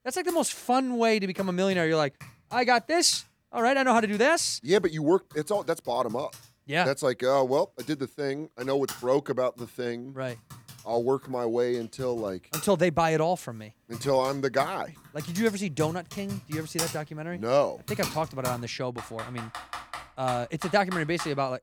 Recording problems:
household noises; noticeable; throughout; 15 dB below the speech

